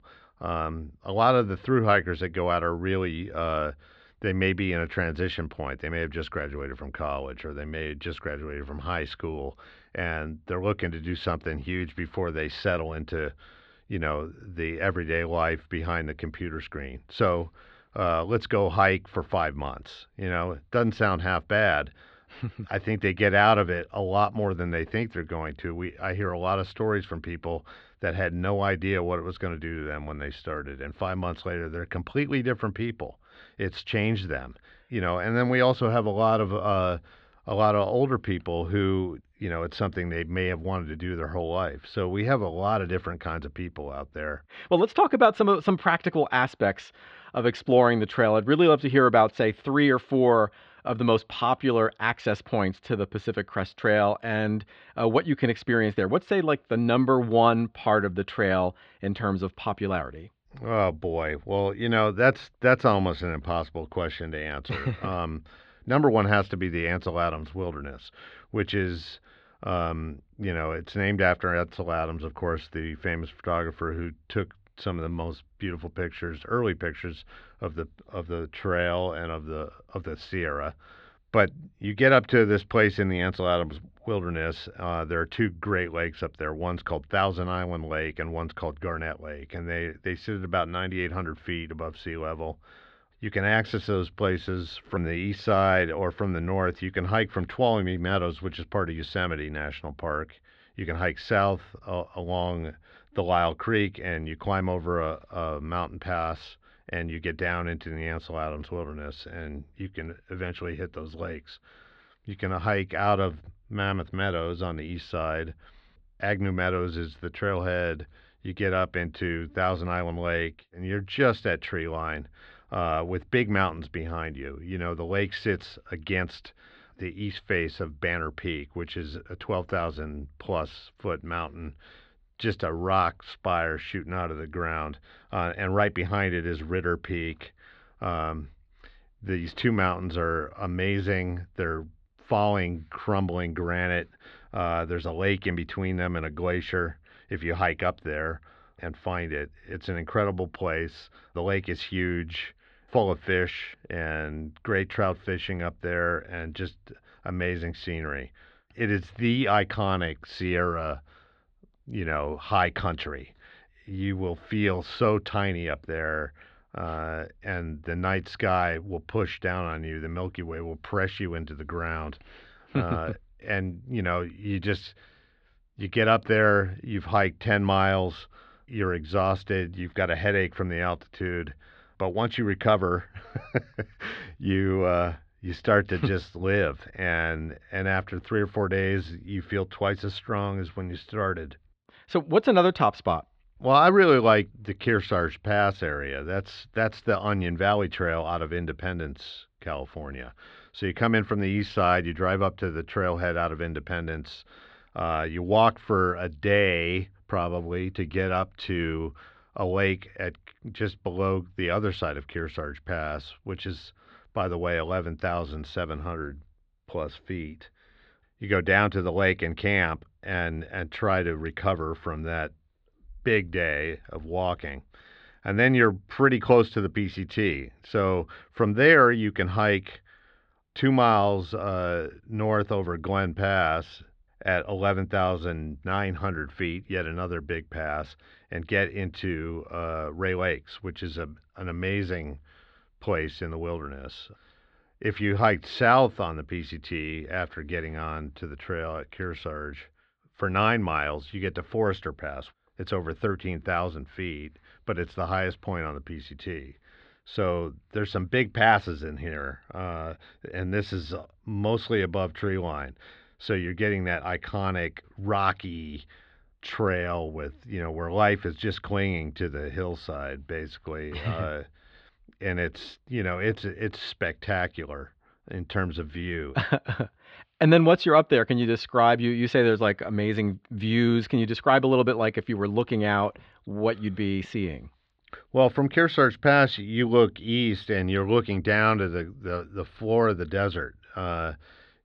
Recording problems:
muffled; slightly; fading above 4 kHz

